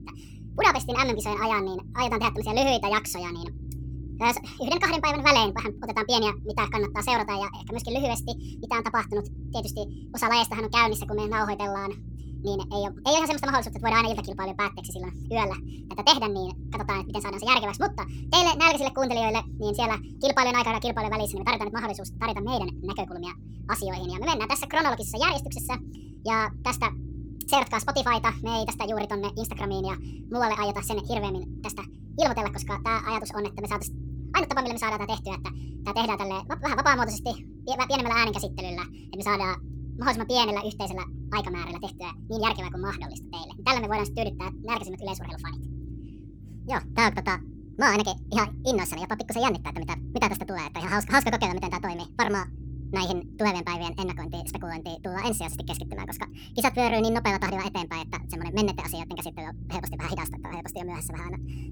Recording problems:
wrong speed and pitch; too fast and too high; 1.6 times normal speed
low rumble; faint; throughout; 25 dB below the speech

